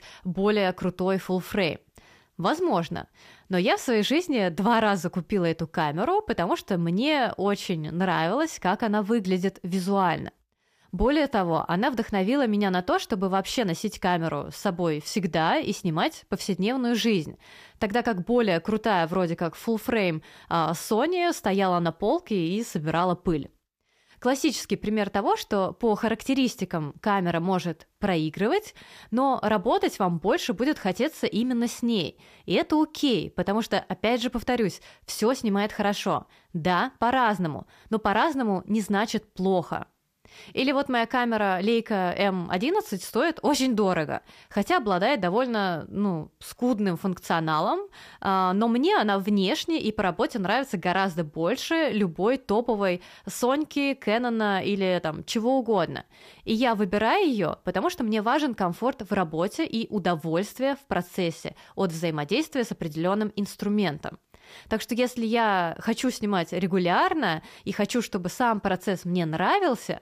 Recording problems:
none

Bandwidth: 15 kHz